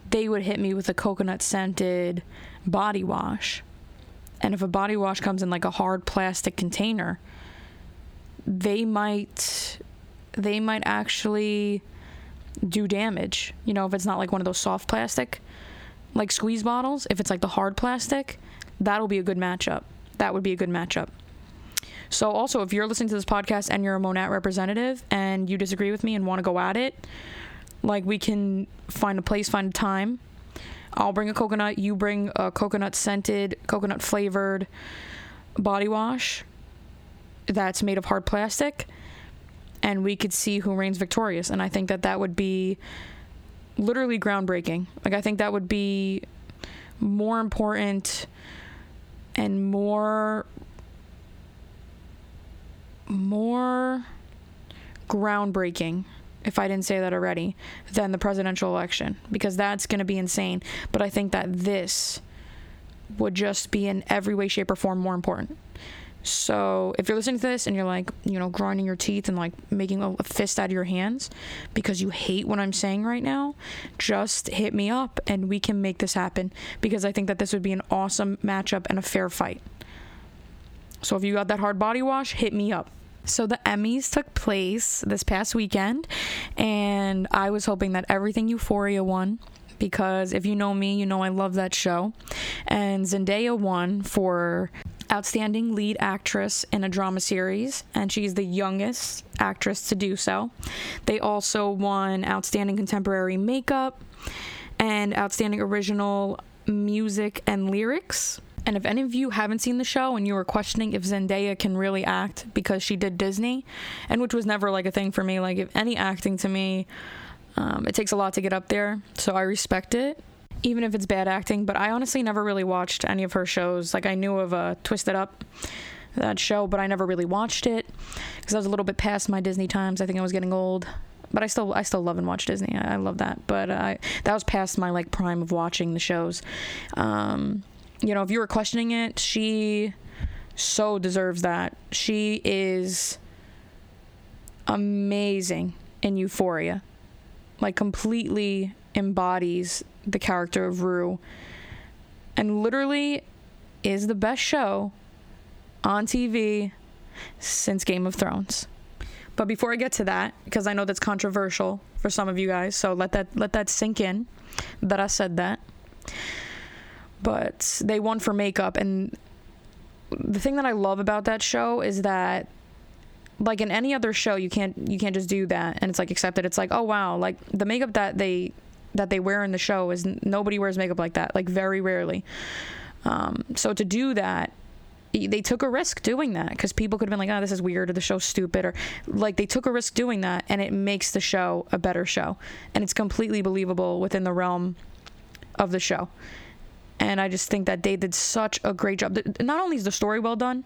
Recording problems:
squashed, flat; heavily

